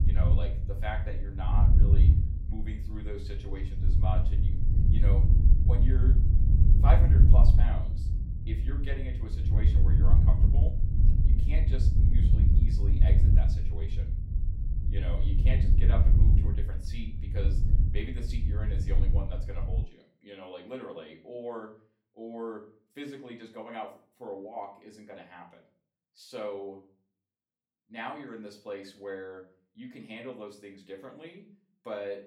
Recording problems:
off-mic speech; far
room echo; slight; dies away in 0.4 s
wind noise on the microphone; heavy; until 20 s; 2 dB below the speech

